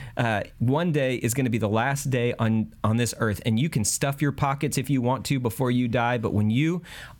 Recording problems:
squashed, flat; somewhat

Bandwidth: 17 kHz